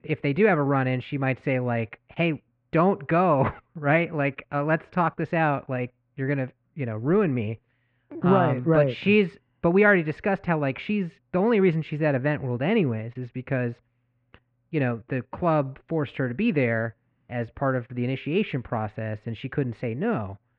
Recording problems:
muffled; very; fading above 2.5 kHz

